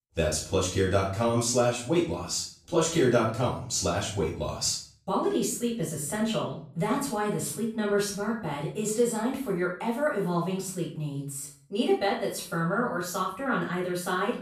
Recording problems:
off-mic speech; far
room echo; noticeable; dies away in 0.5 s

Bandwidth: 14.5 kHz